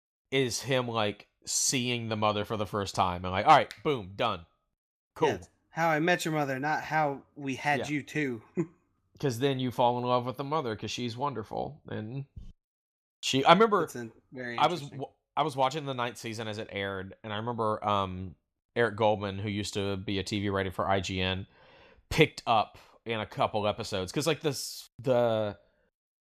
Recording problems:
none

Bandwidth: 14.5 kHz